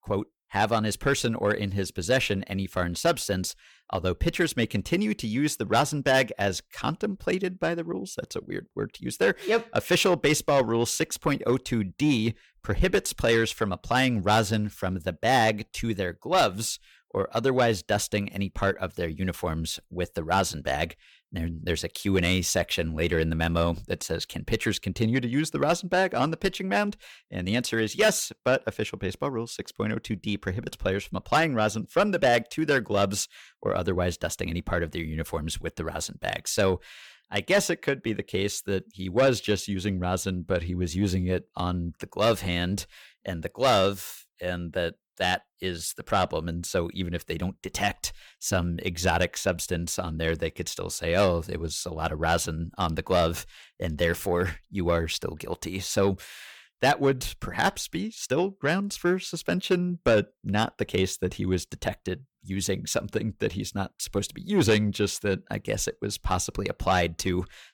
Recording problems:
distortion; slight; 10 dB below the speech

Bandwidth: 19 kHz